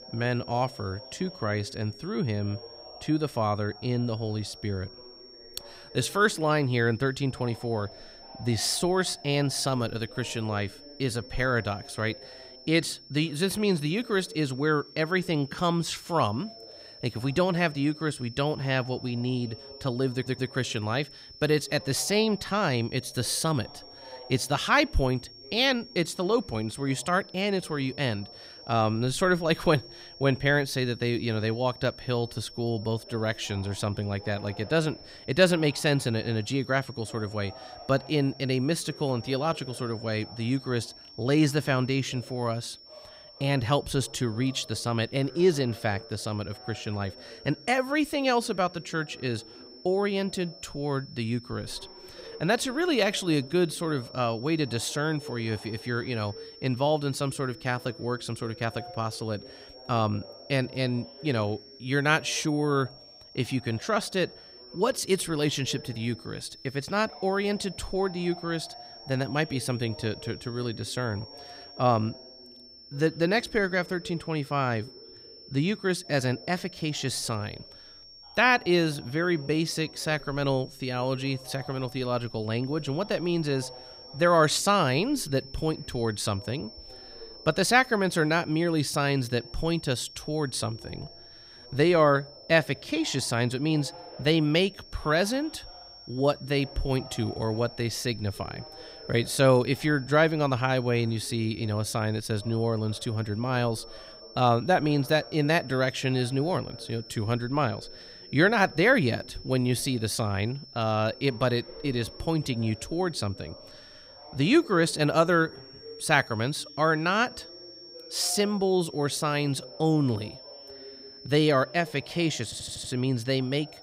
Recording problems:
high-pitched whine; noticeable; throughout; 5.5 kHz, 20 dB below the speech
voice in the background; faint; throughout; 25 dB below the speech
audio stuttering; at 20 s and at 2:02

